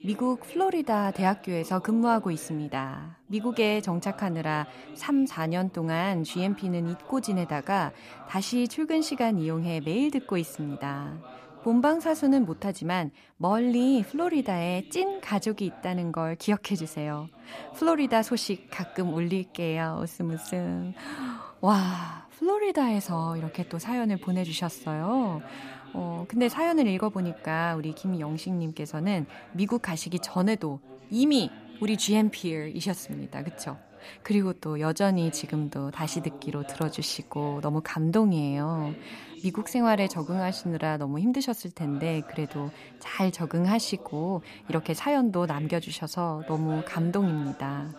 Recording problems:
voice in the background; noticeable; throughout; 20 dB below the speech

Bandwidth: 14.5 kHz